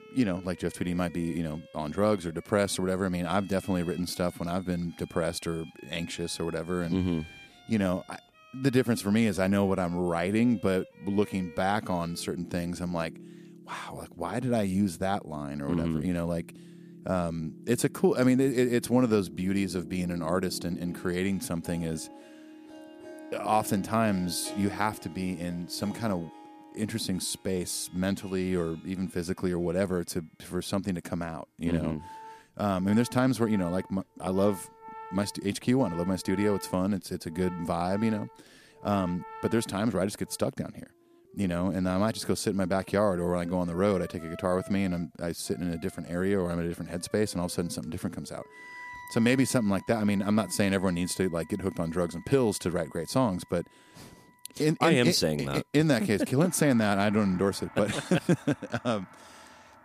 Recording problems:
background music; noticeable; throughout; 20 dB below the speech

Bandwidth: 14.5 kHz